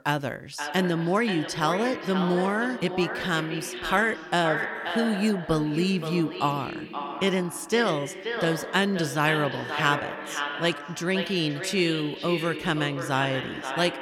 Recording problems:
echo of what is said; strong; throughout; 530 ms later, 6 dB below the speech

